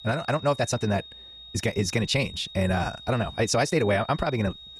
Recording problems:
wrong speed, natural pitch; too fast; 1.7 times normal speed
high-pitched whine; noticeable; throughout; 3.5 kHz, 15 dB below the speech

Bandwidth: 14.5 kHz